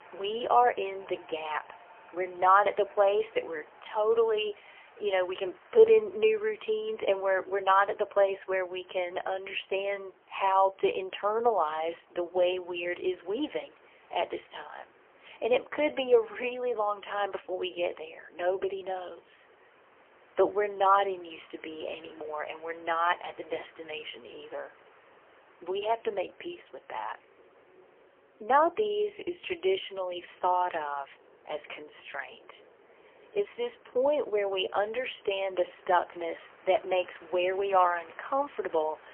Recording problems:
phone-call audio; poor line; nothing above 3 kHz
train or aircraft noise; faint; throughout; 25 dB below the speech

